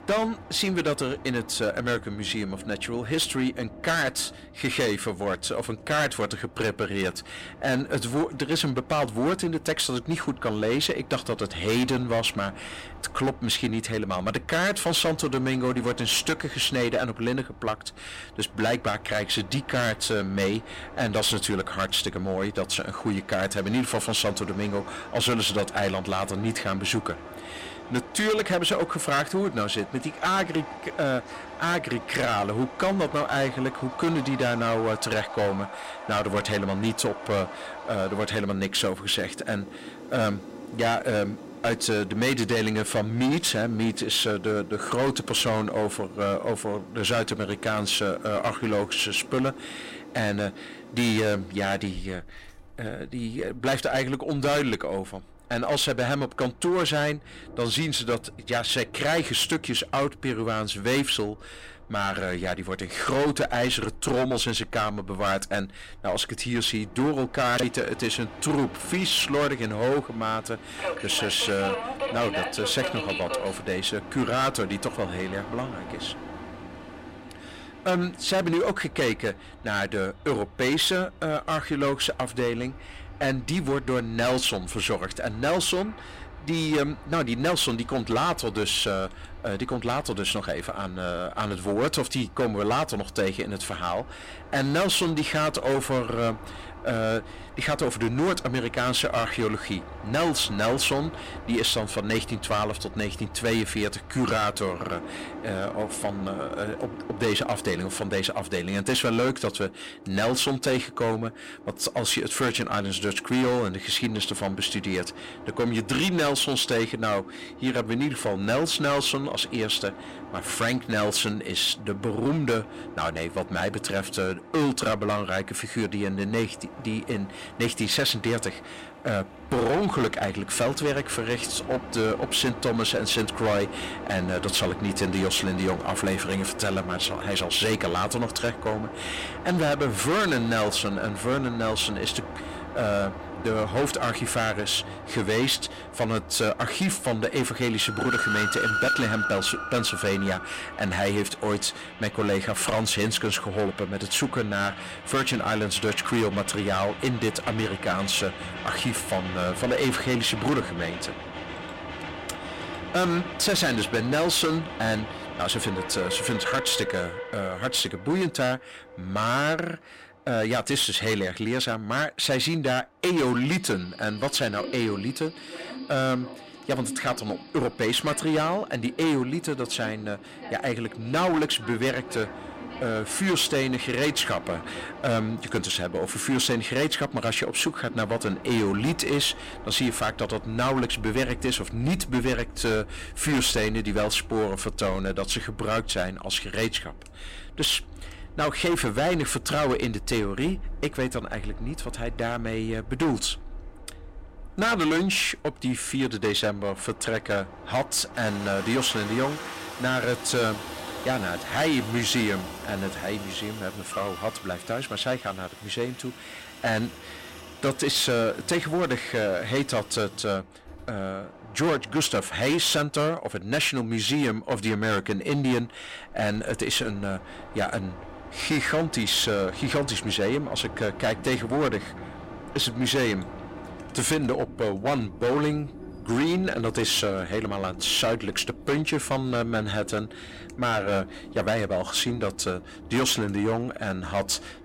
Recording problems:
distortion; heavy; 11% of the sound clipped
train or aircraft noise; noticeable; throughout; 15 dB below the speech

